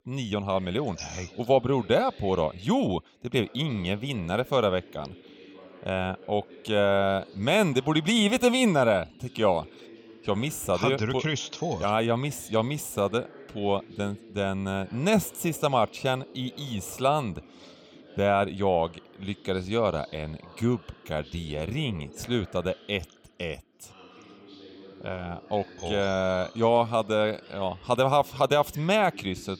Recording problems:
background chatter; faint; throughout; 2 voices, 20 dB below the speech

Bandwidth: 17 kHz